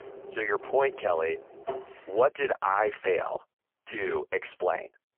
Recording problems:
phone-call audio; poor line
traffic noise; noticeable; until 1.5 s; 15 dB below the speech

